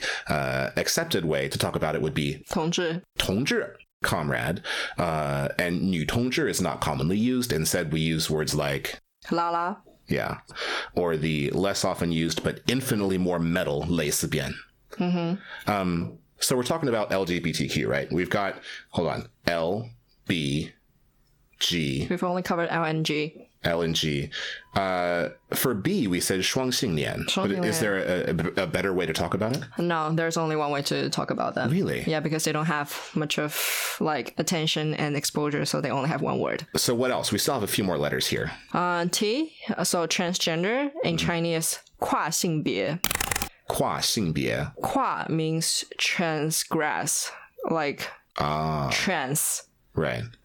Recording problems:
squashed, flat; heavily
keyboard typing; loud; at 43 s; peak 2 dB above the speech

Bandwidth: 18 kHz